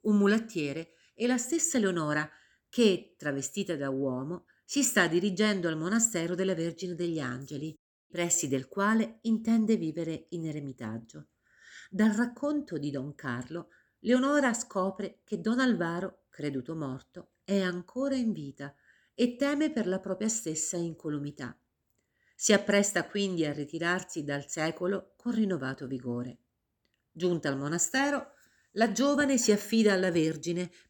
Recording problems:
none

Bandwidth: 18.5 kHz